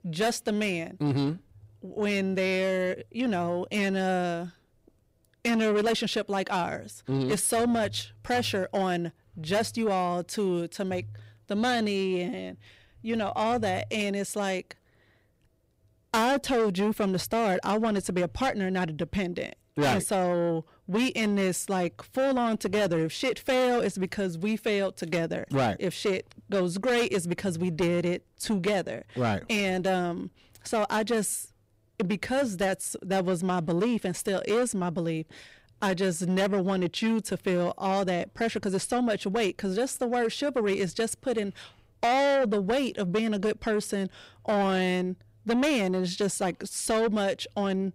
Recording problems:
distortion; heavy; 8 dB below the speech

